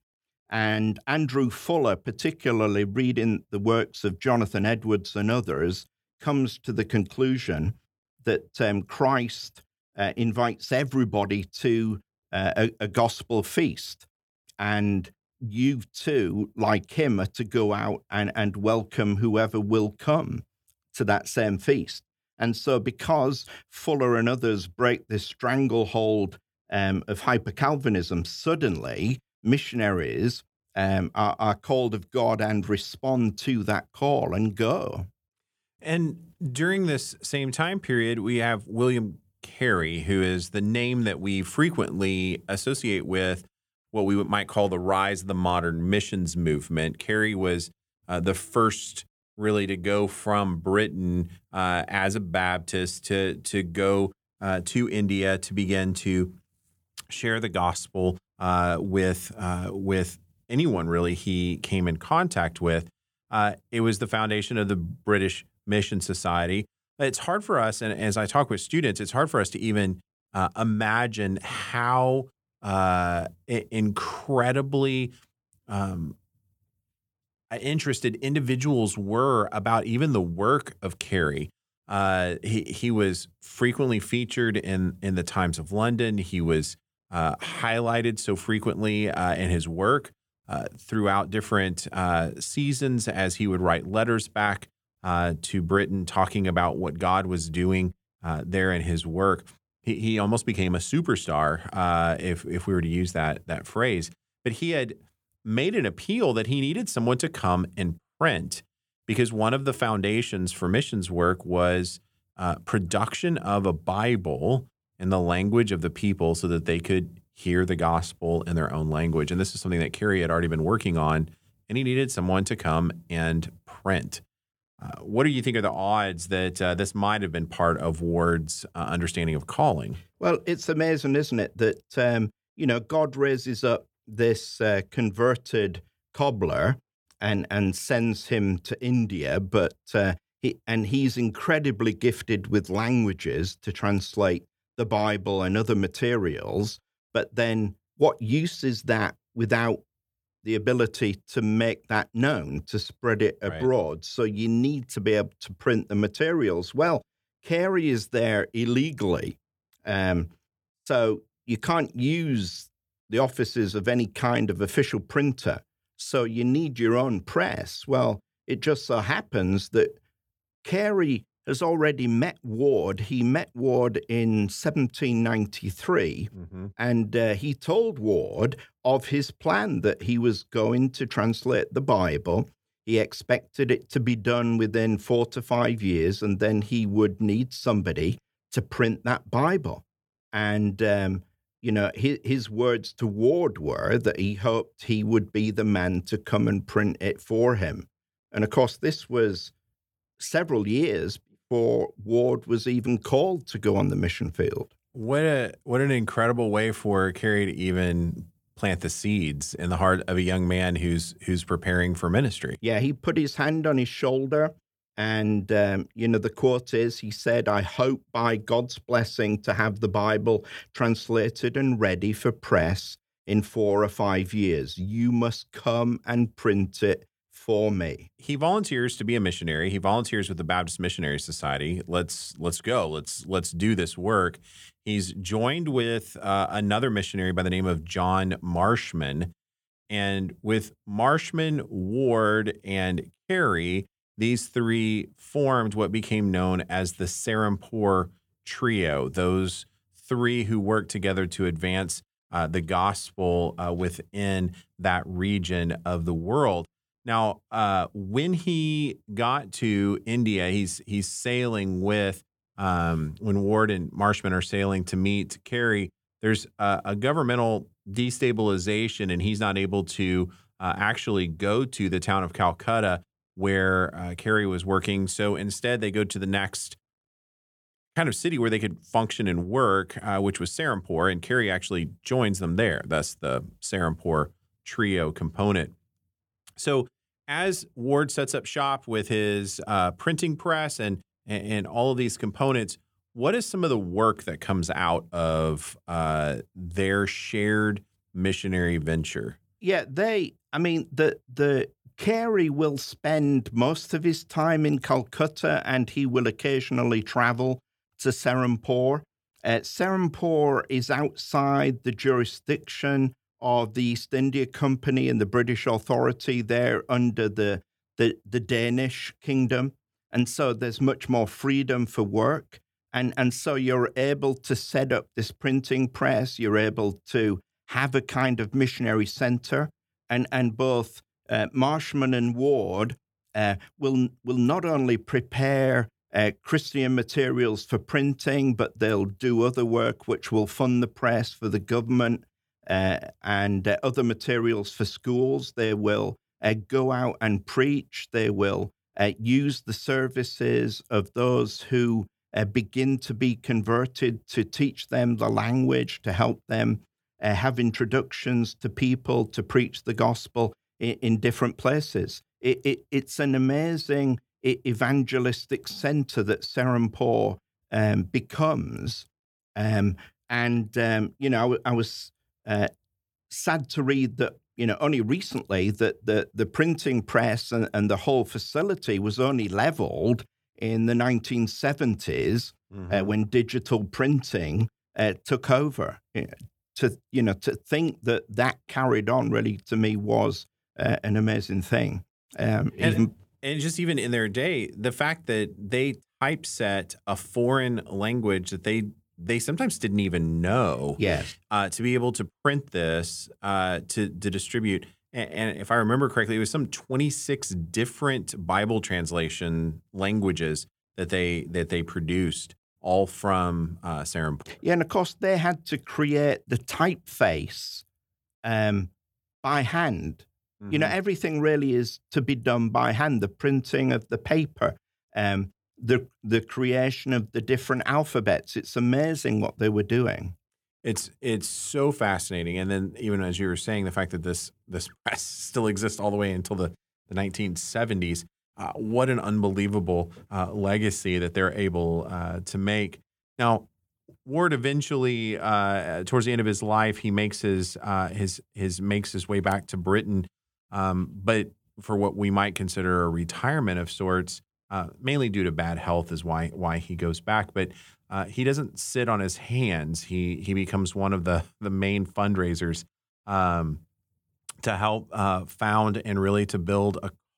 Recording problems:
none

